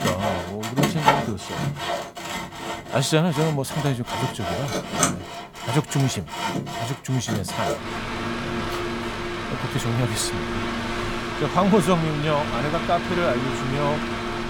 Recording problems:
machinery noise; loud; throughout; 2 dB below the speech

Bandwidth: 18 kHz